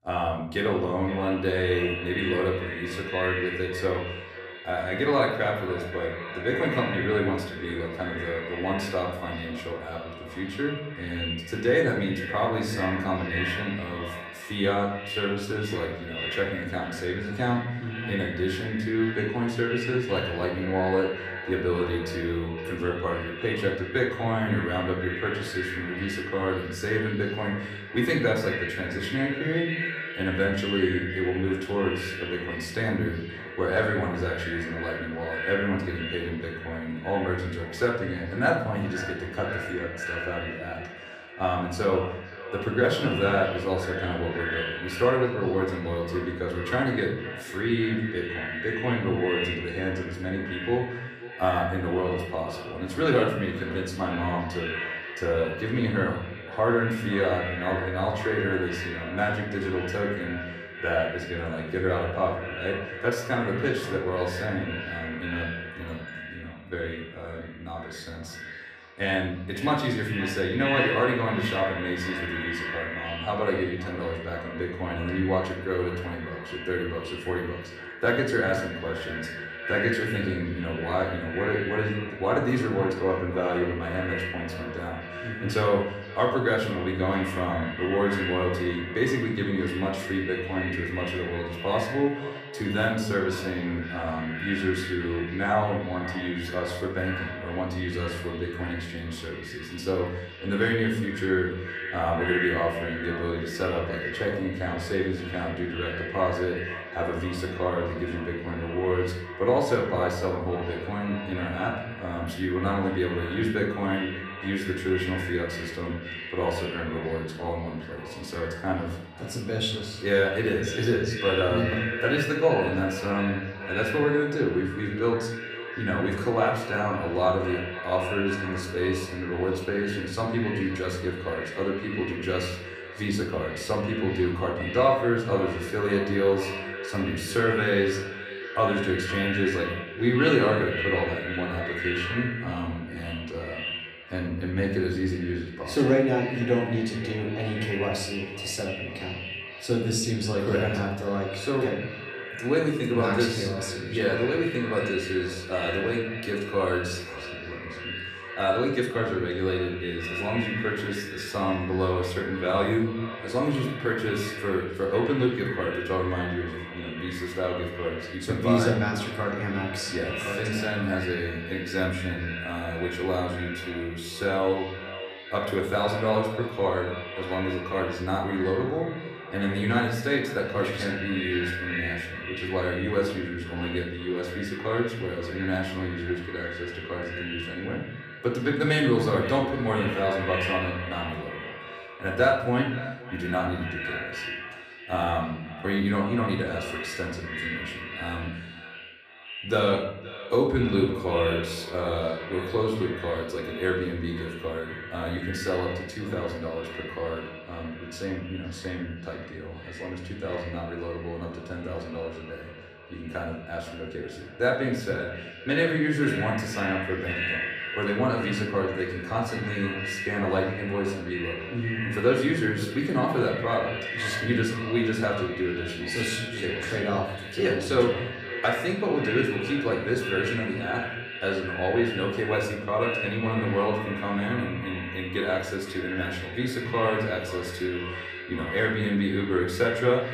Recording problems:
echo of what is said; strong; throughout; 520 ms later, 7 dB below the speech
off-mic speech; far
room echo; noticeable; dies away in 0.7 s

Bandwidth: 14.5 kHz